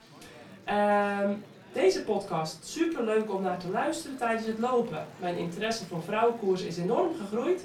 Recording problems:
off-mic speech; far
room echo; slight; dies away in 0.3 s
chatter from many people; faint; throughout; 20 dB below the speech

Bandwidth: 19 kHz